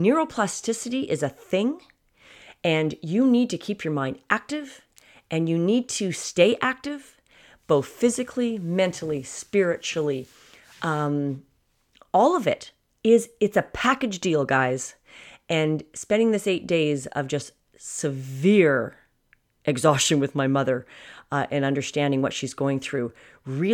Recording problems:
abrupt cut into speech; at the start and the end

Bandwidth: 18 kHz